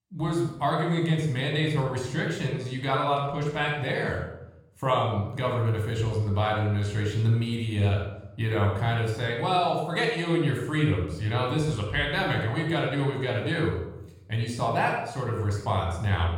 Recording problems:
room echo; noticeable; dies away in 0.7 s
off-mic speech; somewhat distant

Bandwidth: 16 kHz